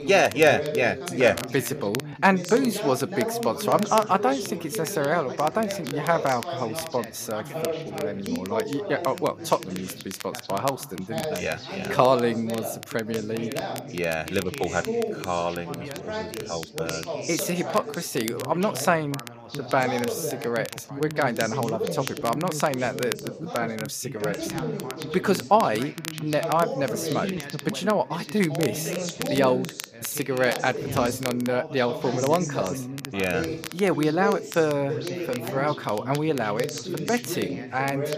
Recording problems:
background chatter; loud; throughout; 3 voices, 7 dB below the speech
crackle, like an old record; noticeable; 15 dB below the speech

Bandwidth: 14.5 kHz